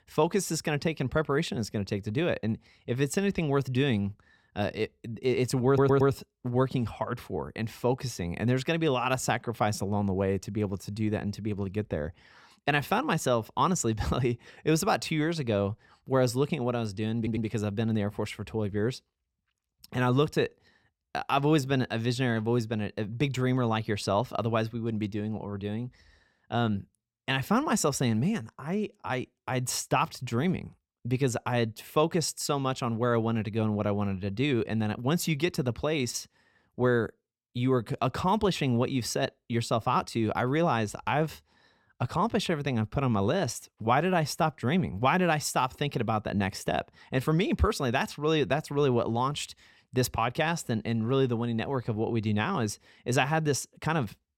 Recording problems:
audio stuttering; at 5.5 s and at 17 s

